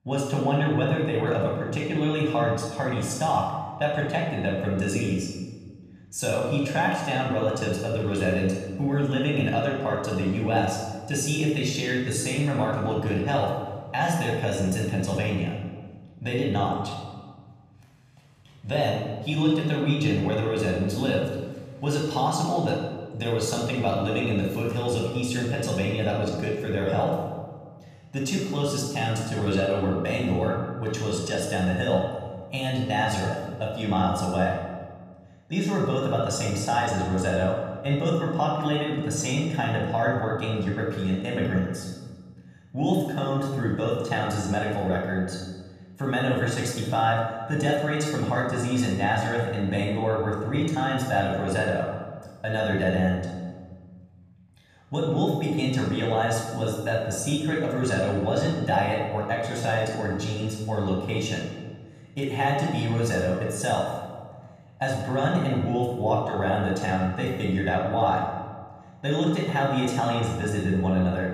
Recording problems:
room echo; noticeable; dies away in 1.3 s
off-mic speech; somewhat distant

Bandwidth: 14.5 kHz